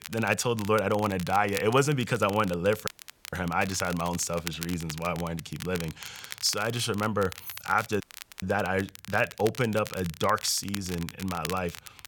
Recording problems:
crackle, like an old record; noticeable; 15 dB below the speech
audio cutting out; at 3 s and at 8 s
jangling keys; faint; at 7.5 s; peak 15 dB below the speech

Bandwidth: 17.5 kHz